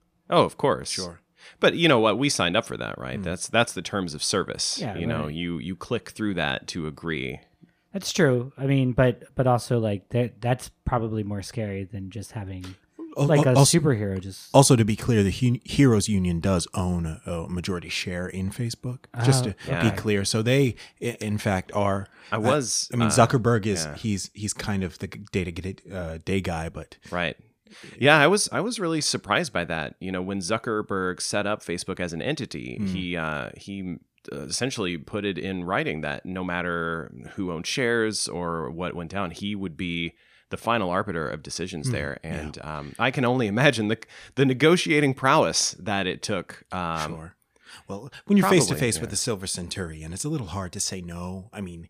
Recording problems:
none

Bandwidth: 15 kHz